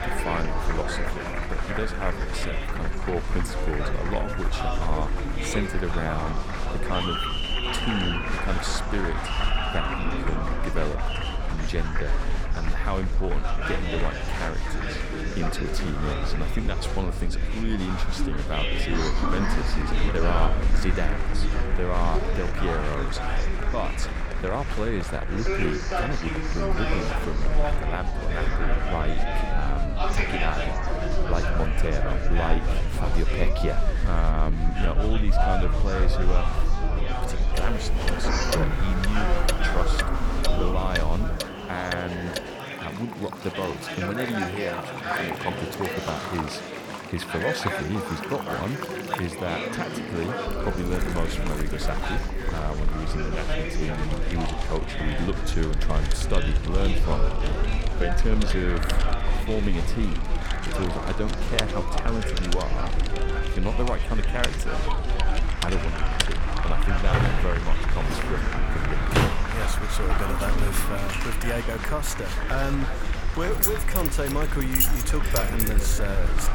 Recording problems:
chatter from many people; very loud; throughout; as loud as the speech
household noises; loud; from 38 s on; 1 dB below the speech
low rumble; noticeable; until 41 s and from 50 s on; 15 dB below the speech

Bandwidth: 17.5 kHz